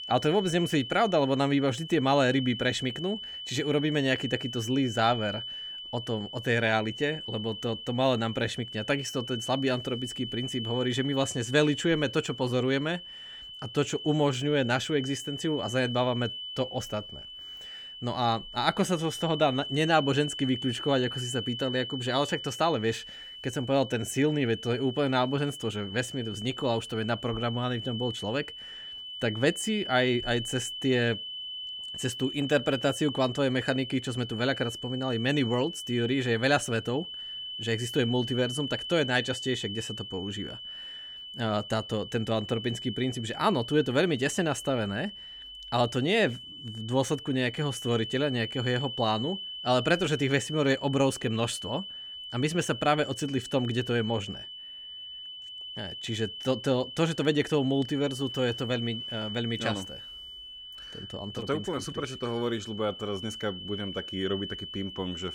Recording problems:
high-pitched whine; loud; throughout; 3 kHz, 9 dB below the speech

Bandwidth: 17 kHz